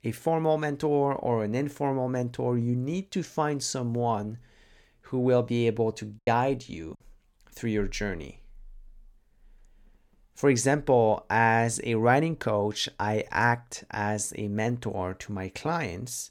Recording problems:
choppy; very; at 6 s; 8% of the speech affected

